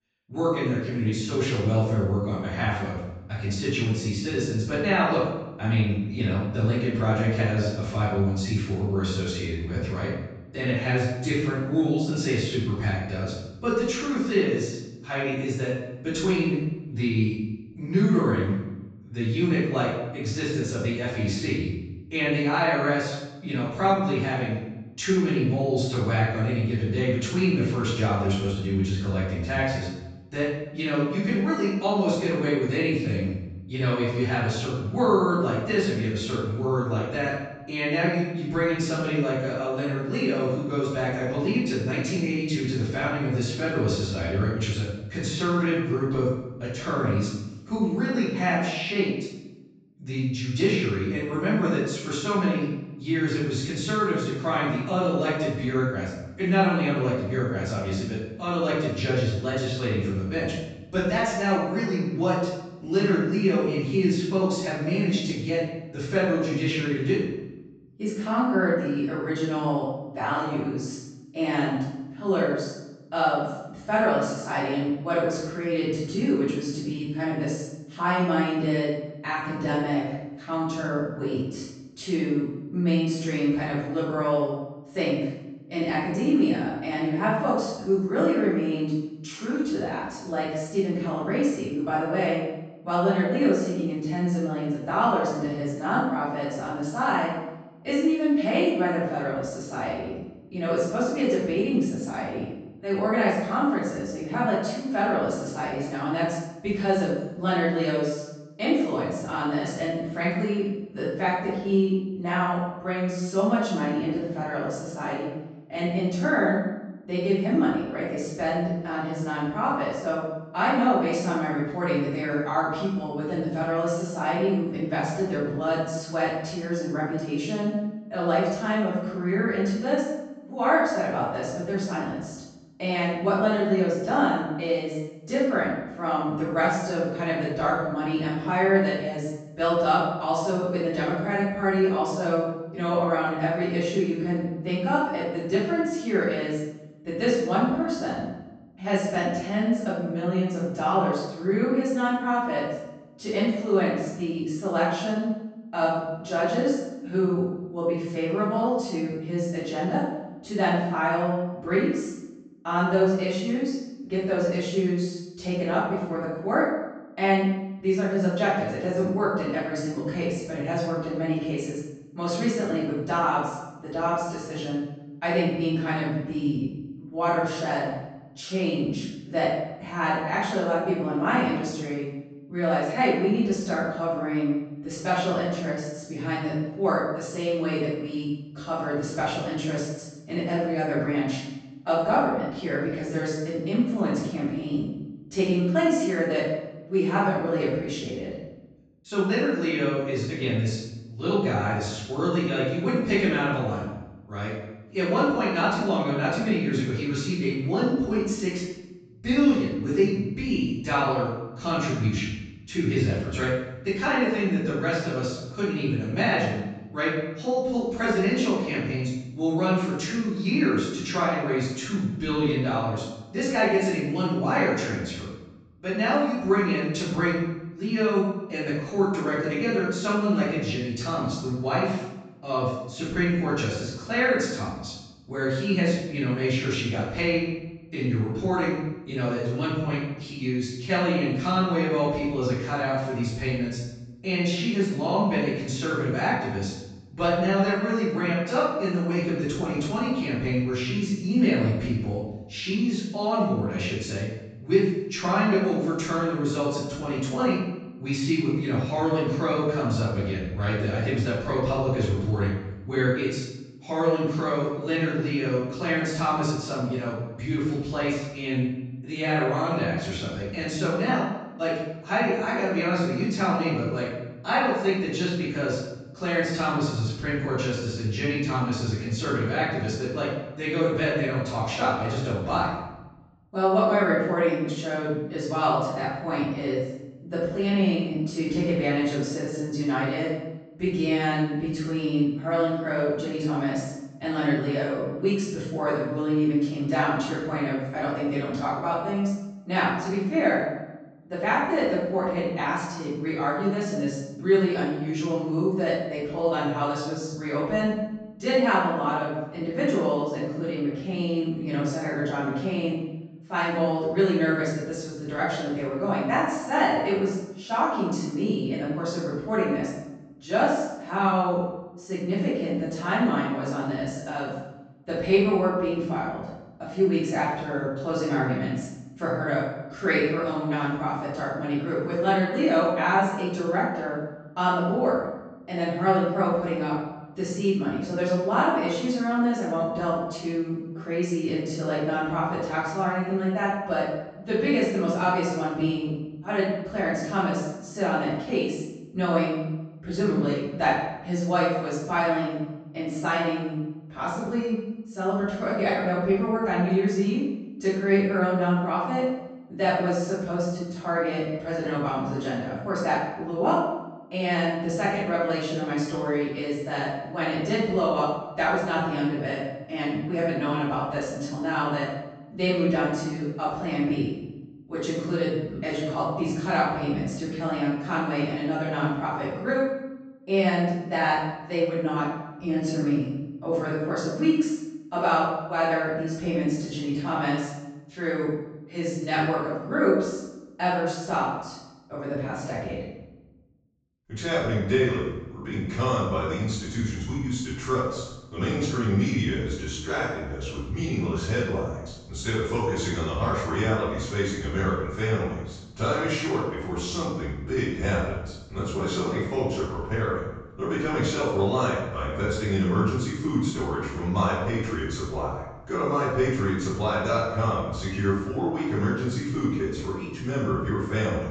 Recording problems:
room echo; strong; dies away in 0.8 s
off-mic speech; far
high frequencies cut off; noticeable; nothing above 8 kHz

